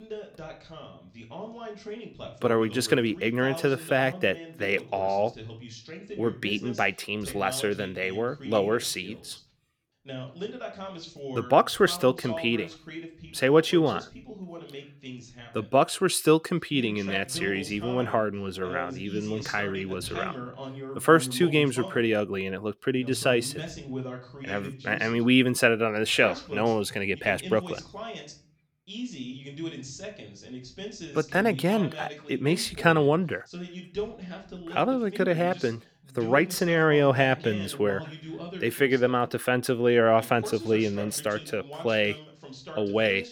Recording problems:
voice in the background; noticeable; throughout; 15 dB below the speech

